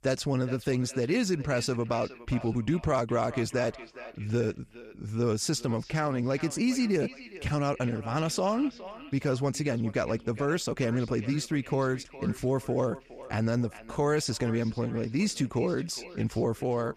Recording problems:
echo of what is said; noticeable; throughout; 410 ms later, 15 dB below the speech

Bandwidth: 14.5 kHz